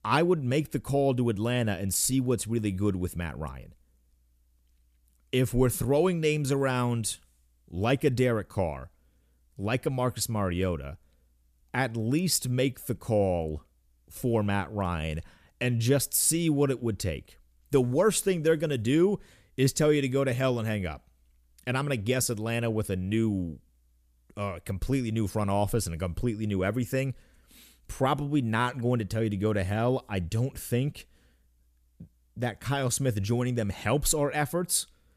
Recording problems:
none

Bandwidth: 14.5 kHz